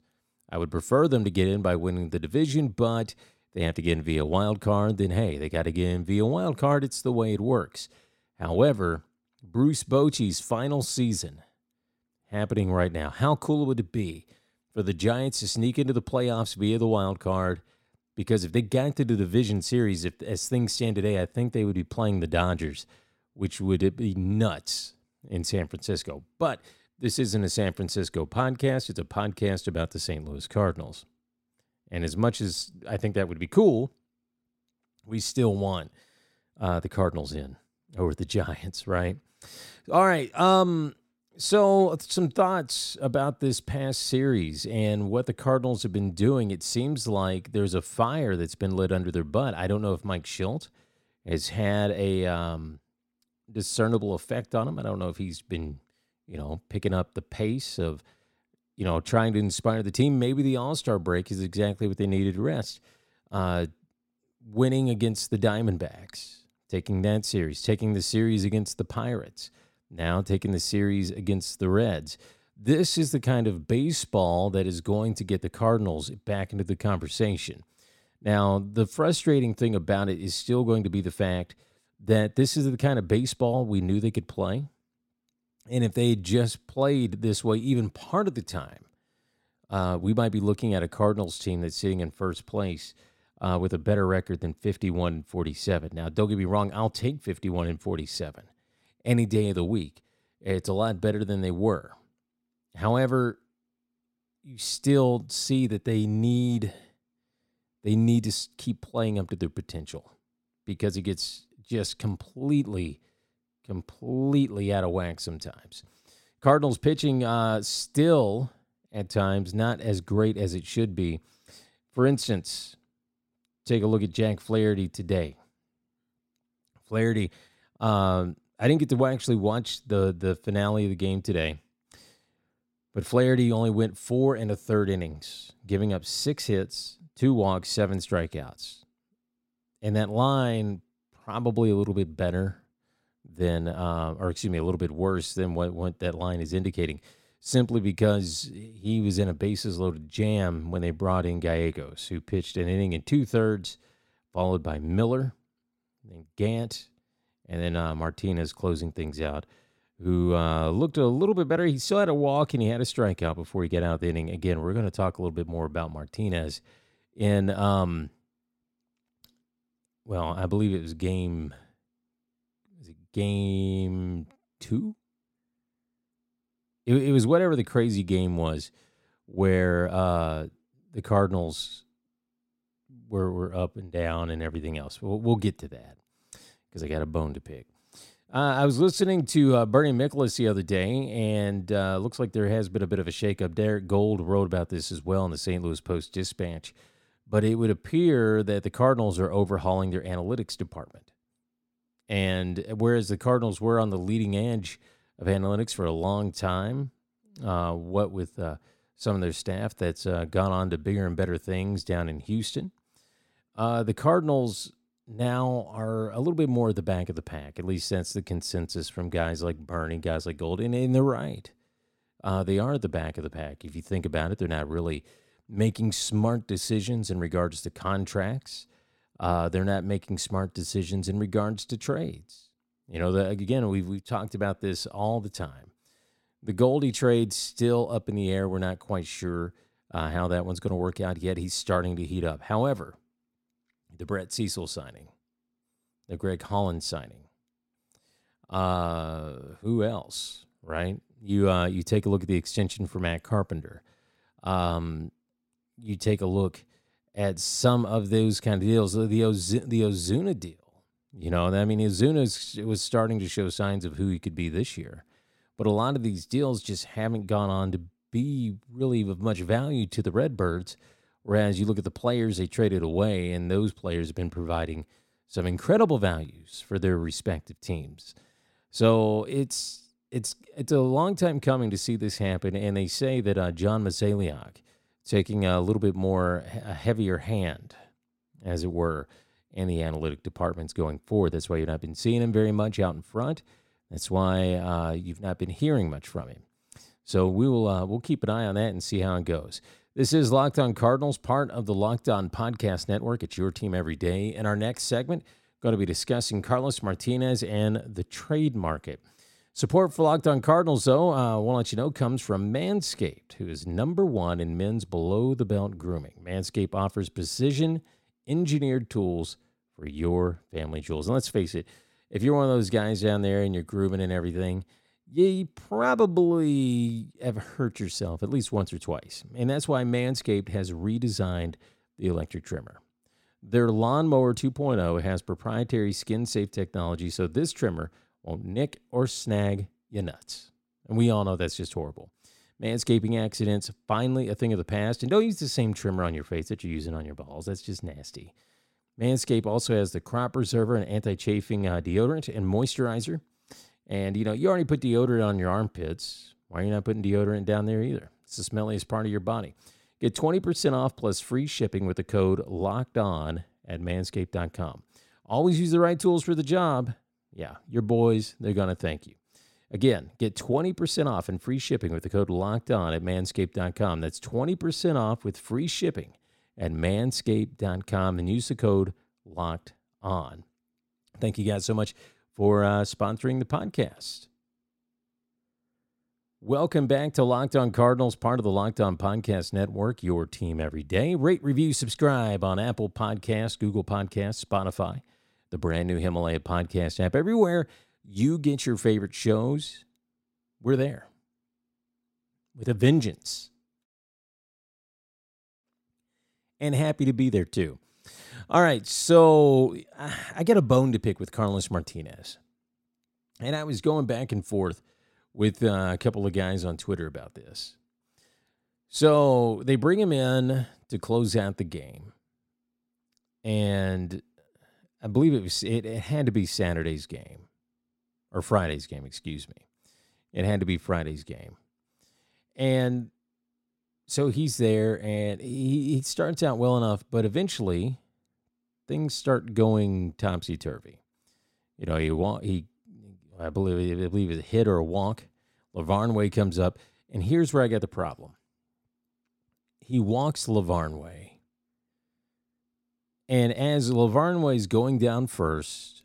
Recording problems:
none

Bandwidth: 16.5 kHz